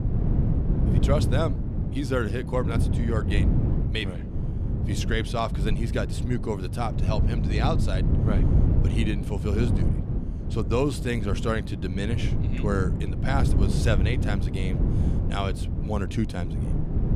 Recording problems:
wind noise on the microphone; heavy; 6 dB below the speech

